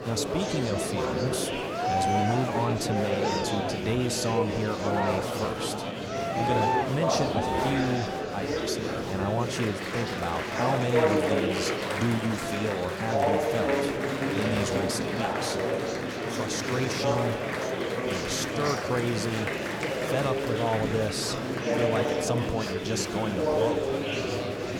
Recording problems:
murmuring crowd; very loud; throughout; 3 dB above the speech

